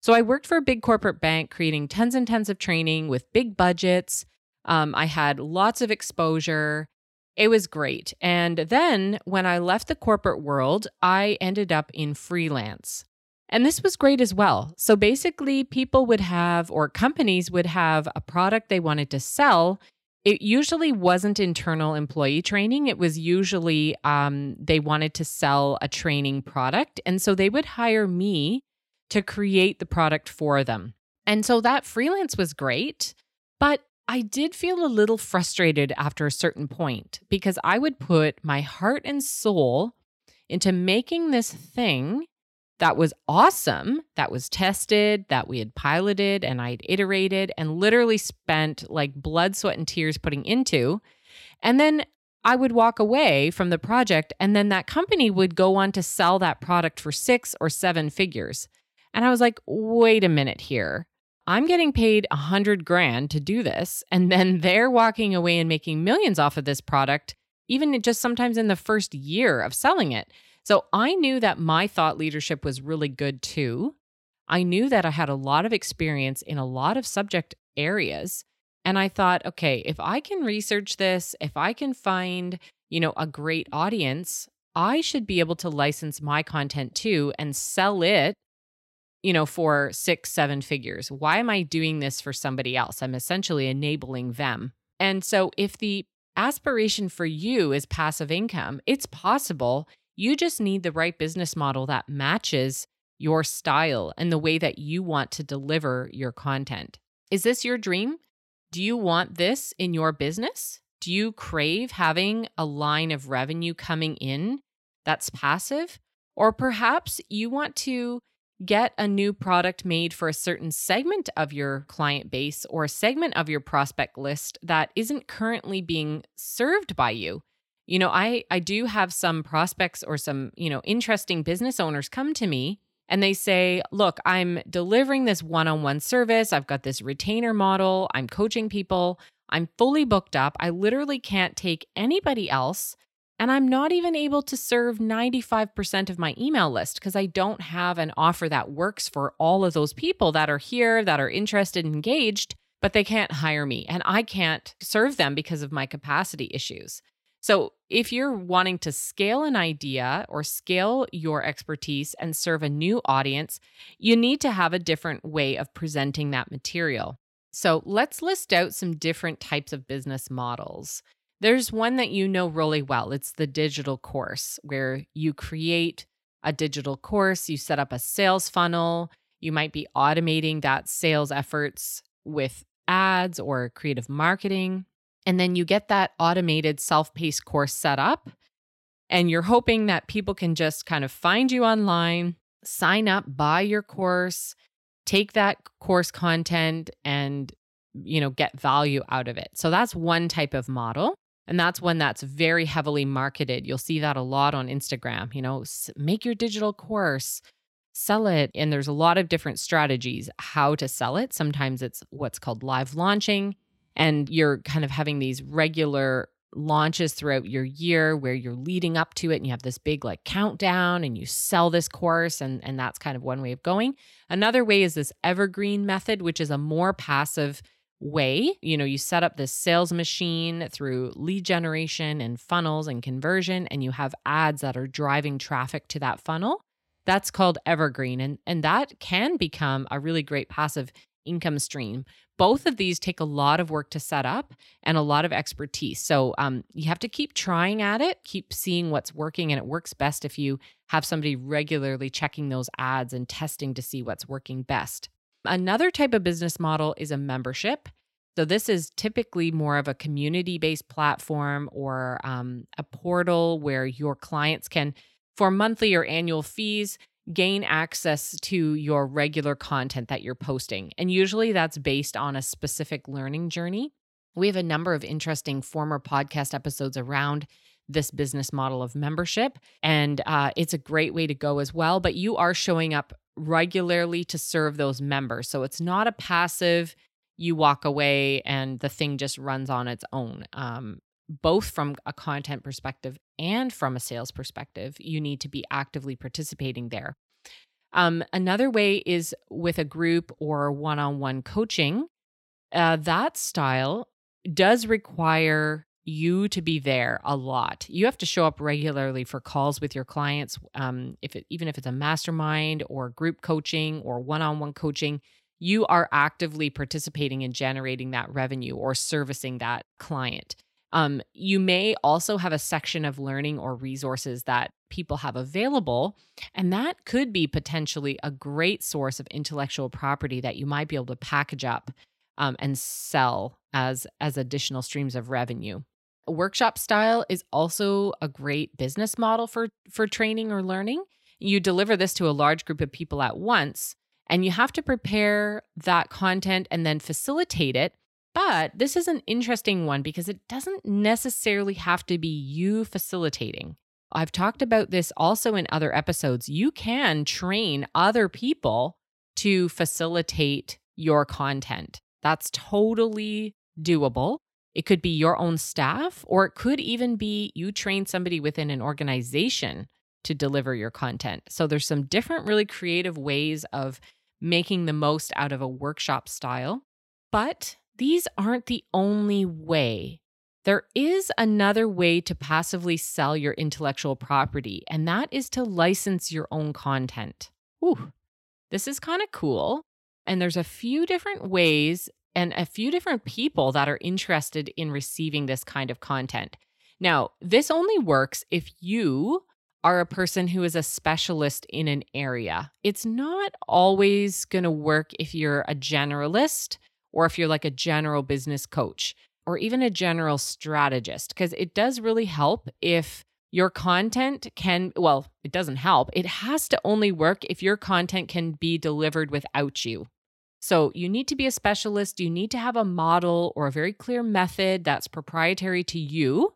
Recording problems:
none

